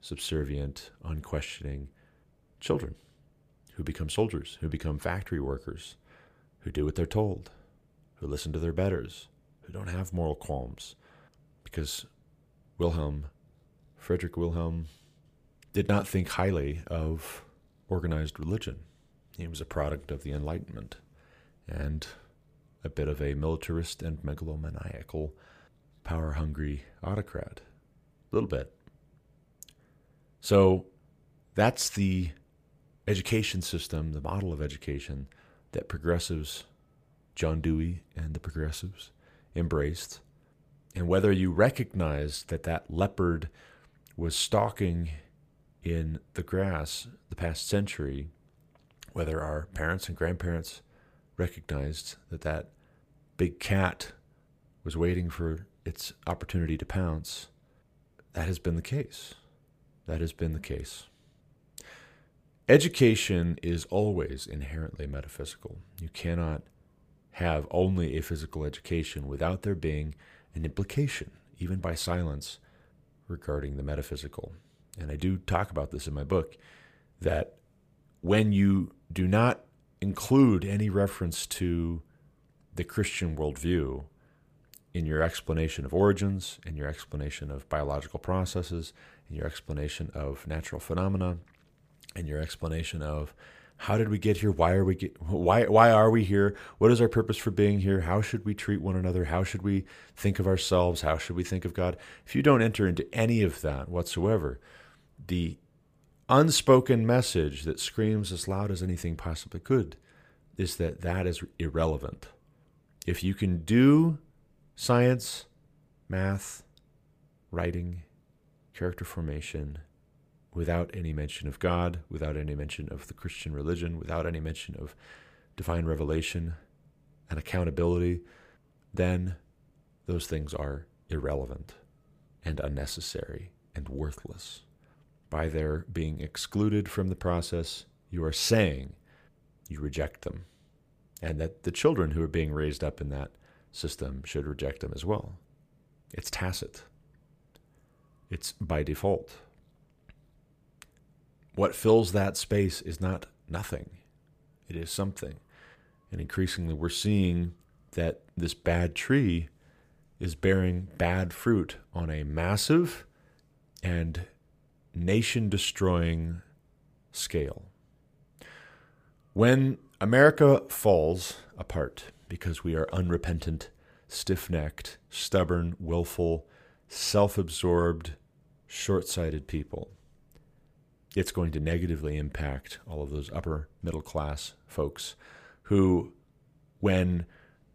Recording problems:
none

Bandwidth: 15 kHz